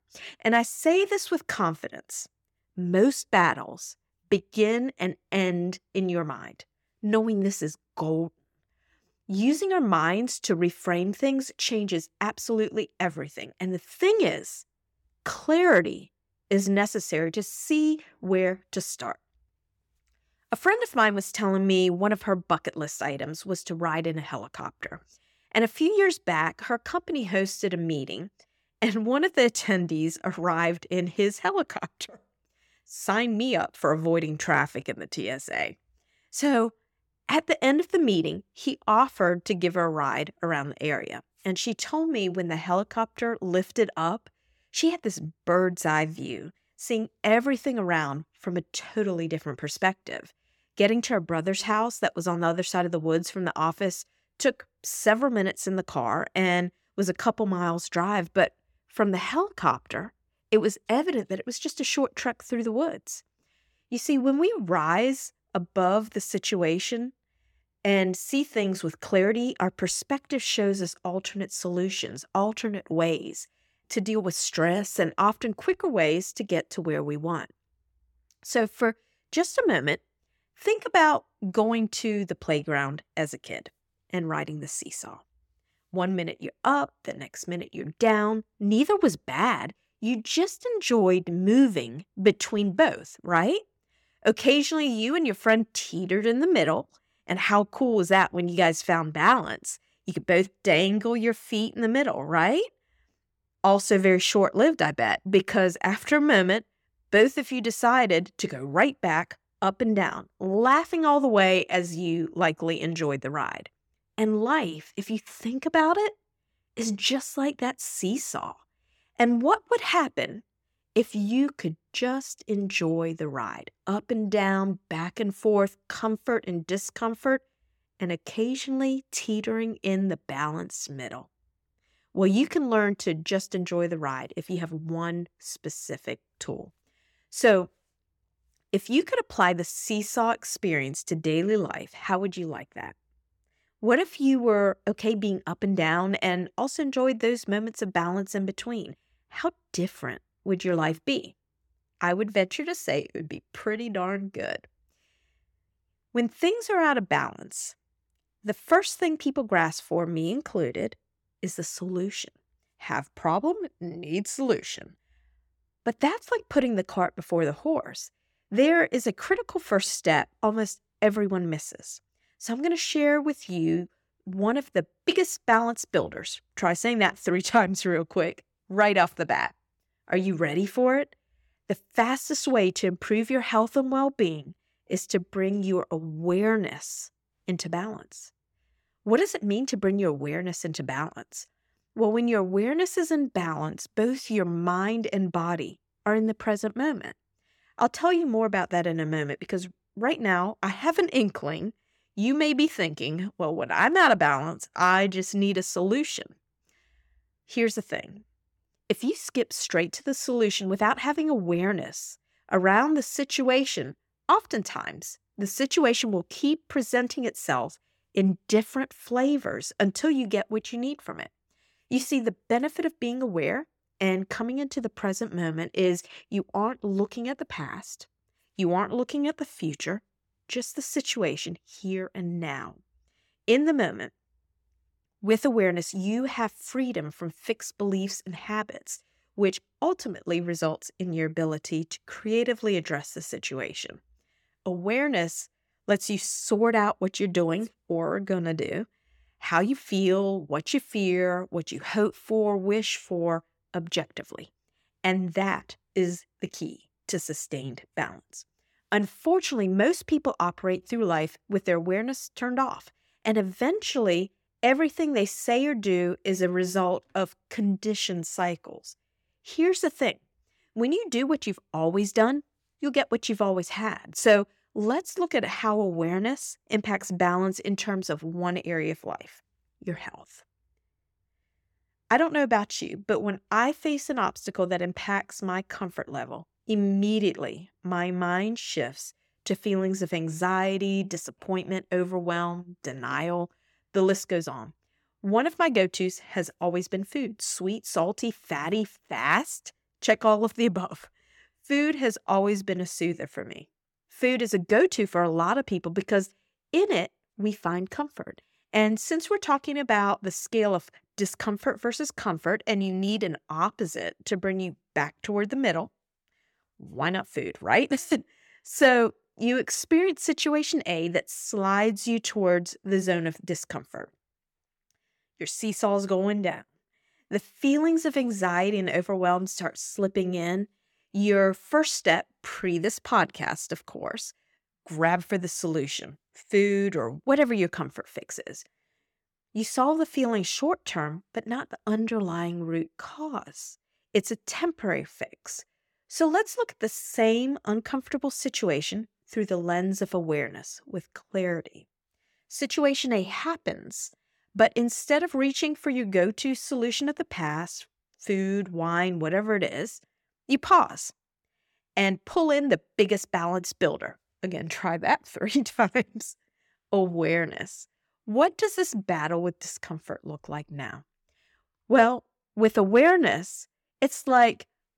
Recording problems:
none

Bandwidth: 17.5 kHz